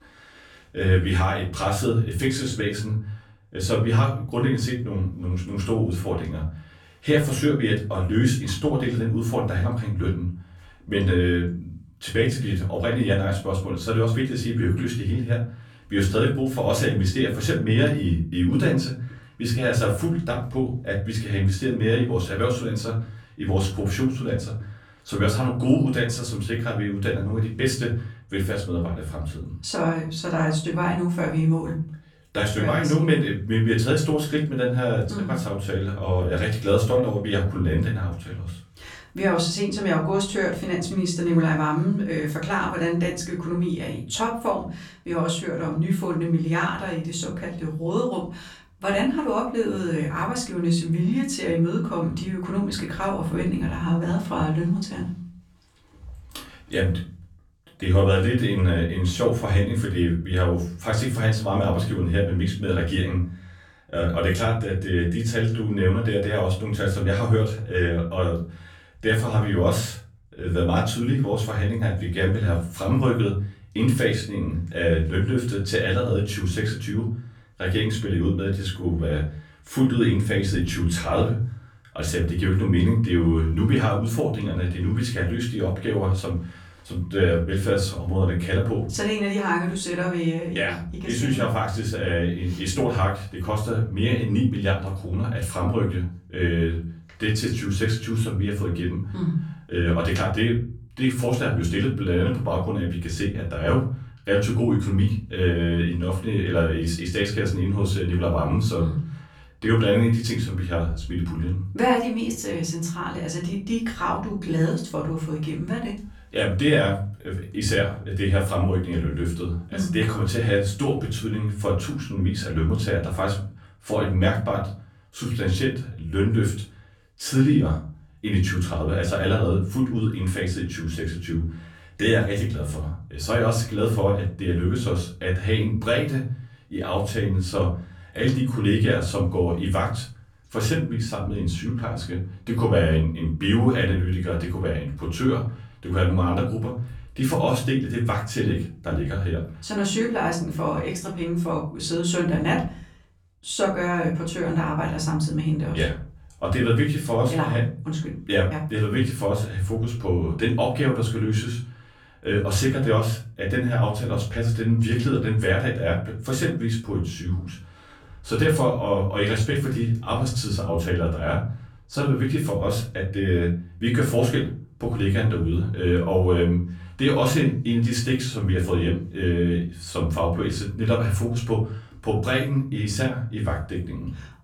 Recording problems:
off-mic speech; far
room echo; slight; dies away in 0.4 s

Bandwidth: 18 kHz